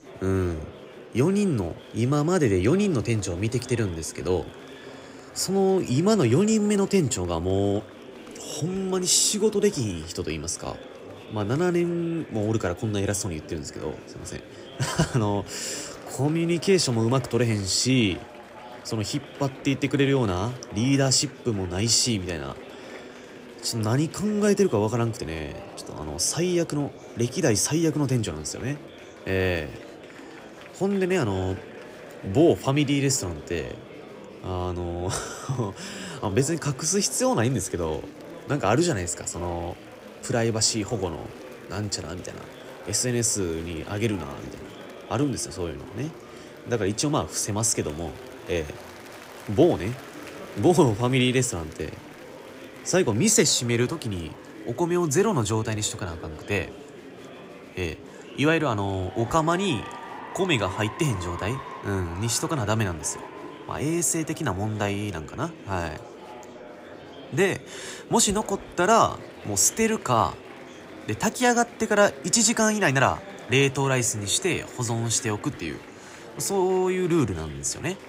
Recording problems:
murmuring crowd; noticeable; throughout; 15 dB below the speech

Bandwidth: 15.5 kHz